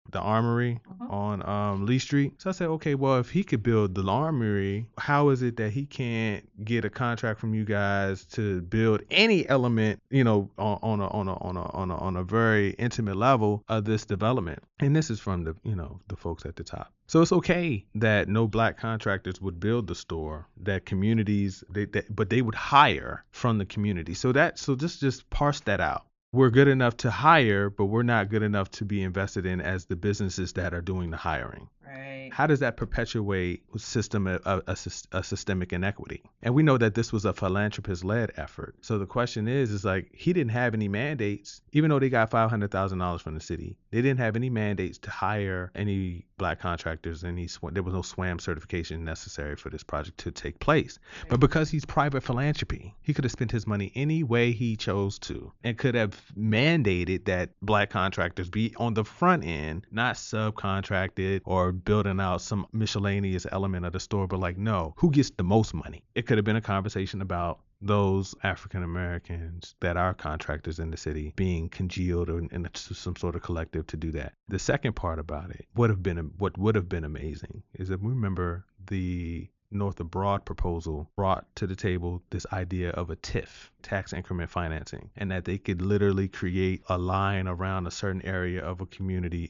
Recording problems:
high frequencies cut off; noticeable; nothing above 7 kHz

